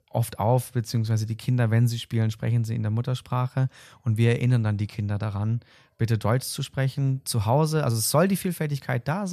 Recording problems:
abrupt cut into speech; at the end

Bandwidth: 14.5 kHz